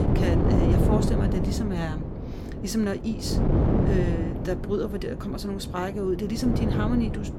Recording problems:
wind noise on the microphone; heavy; 1 dB below the speech

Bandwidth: 17 kHz